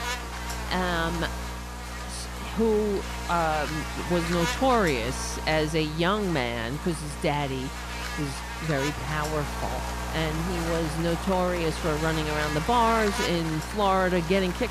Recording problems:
electrical hum; loud; throughout; 60 Hz, 6 dB below the speech
crowd noise; noticeable; throughout; 15 dB below the speech

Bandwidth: 14.5 kHz